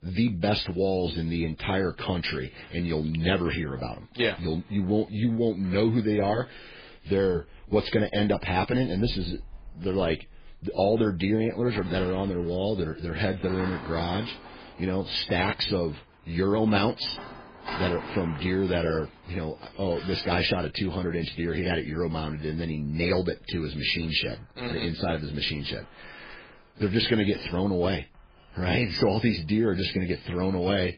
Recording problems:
garbled, watery; badly
household noises; noticeable; throughout; 20 dB below the speech

